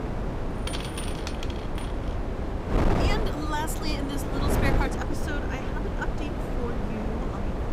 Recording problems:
wind noise on the microphone; heavy; 1 dB above the speech

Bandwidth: 15.5 kHz